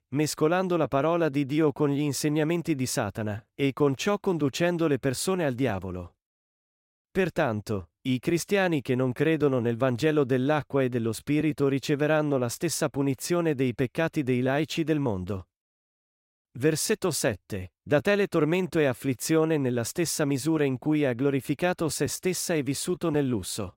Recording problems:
none

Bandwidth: 16 kHz